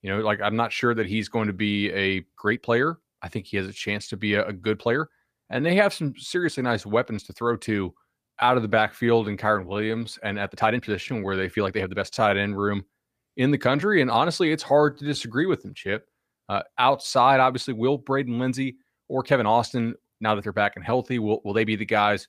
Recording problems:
uneven, jittery; strongly; from 2.5 to 22 s

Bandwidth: 15 kHz